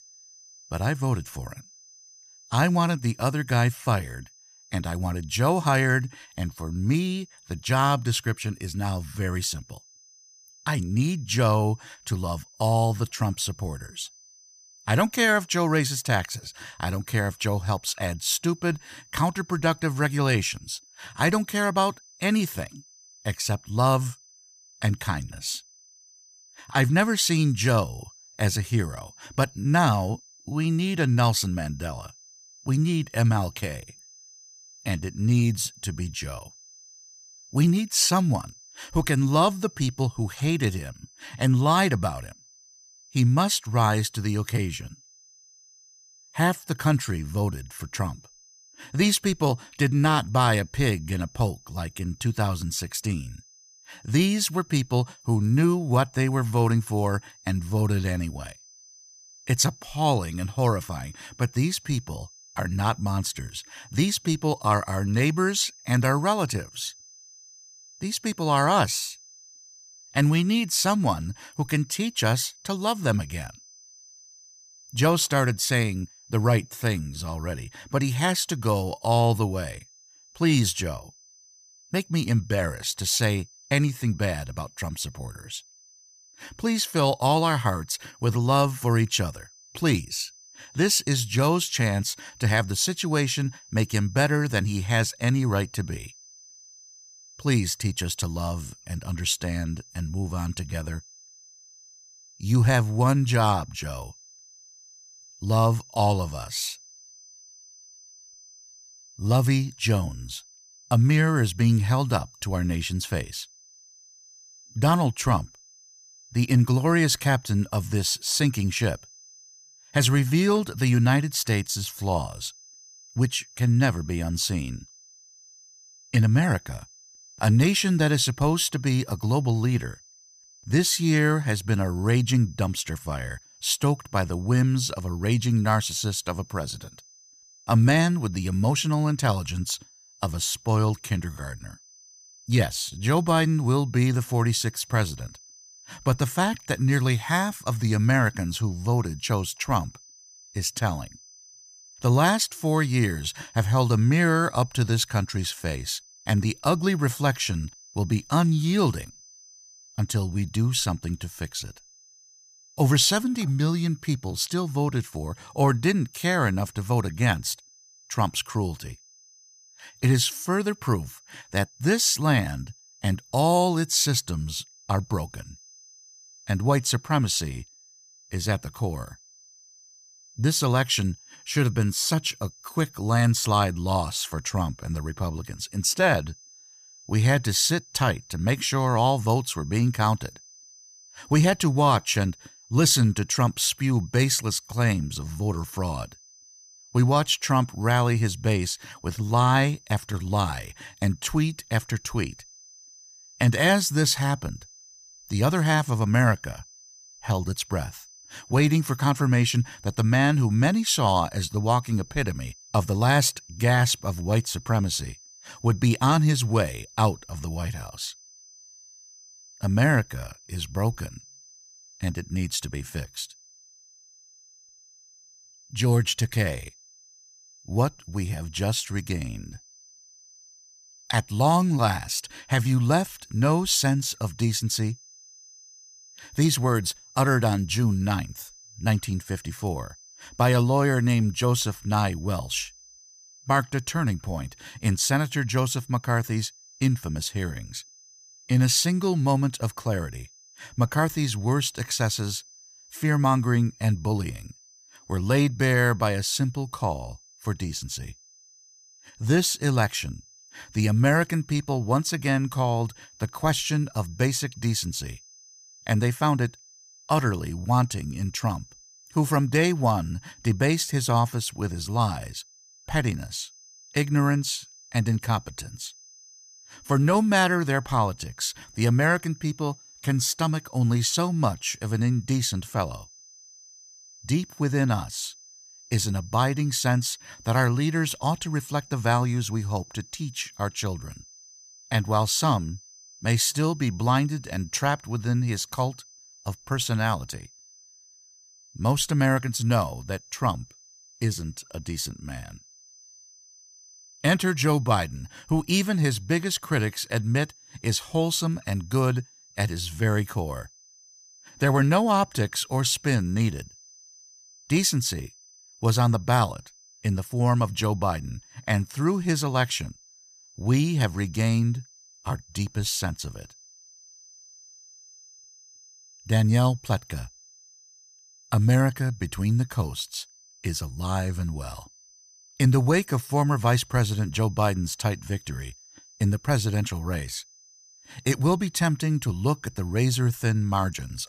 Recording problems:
high-pitched whine; faint; throughout; 6 kHz, 25 dB below the speech

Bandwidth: 14.5 kHz